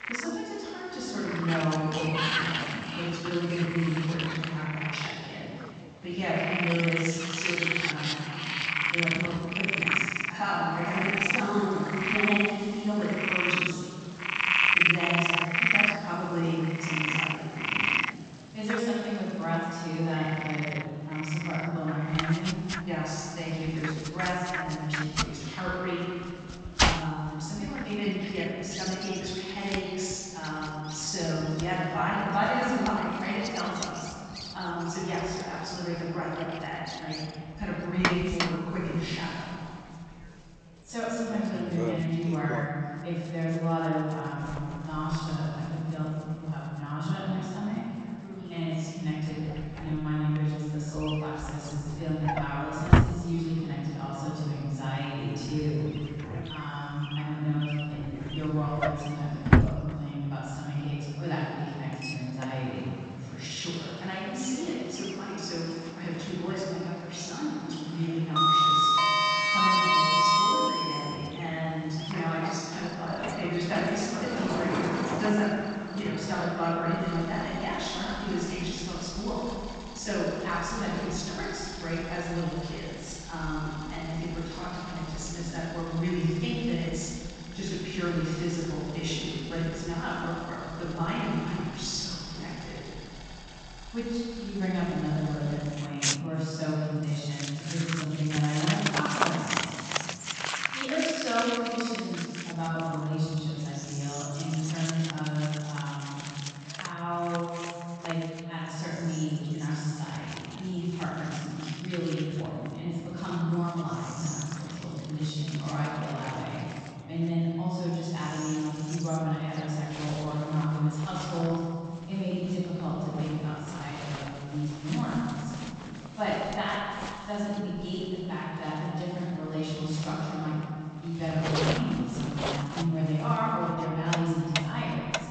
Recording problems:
room echo; strong; dies away in 2.7 s
off-mic speech; far
garbled, watery; slightly; nothing above 7.5 kHz
animal sounds; very loud; throughout; 1 dB above the speech
household noises; very loud; throughout; as loud as the speech
murmuring crowd; faint; throughout; 25 dB below the speech

